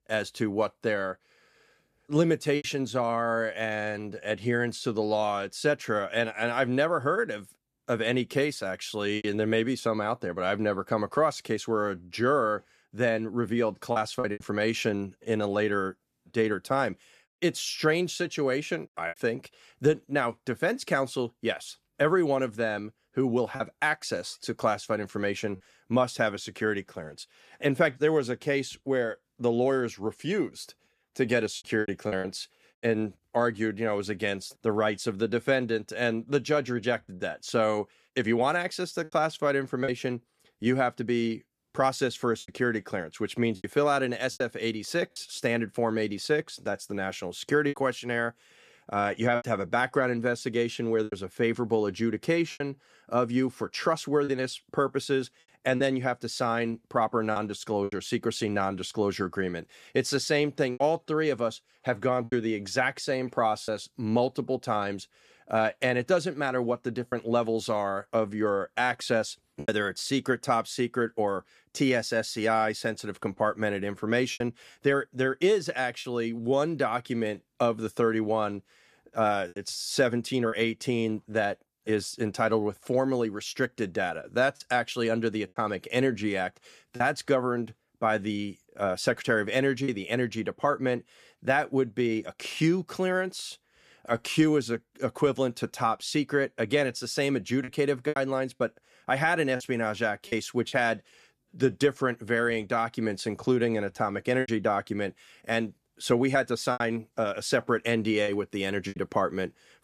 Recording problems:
choppy; occasionally; 3% of the speech affected

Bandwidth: 14.5 kHz